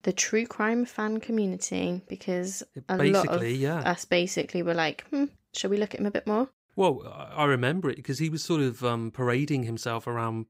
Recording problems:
none

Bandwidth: 15.5 kHz